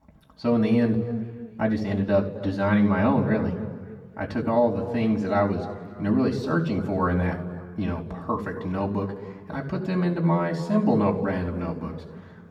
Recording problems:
muffled; slightly; fading above 2 kHz
room echo; slight; dies away in 1.5 s
off-mic speech; somewhat distant

